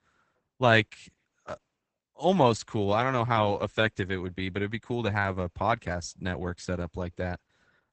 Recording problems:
garbled, watery; badly; nothing above 8 kHz

